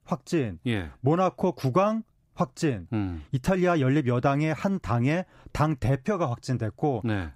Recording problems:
none

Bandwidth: 15.5 kHz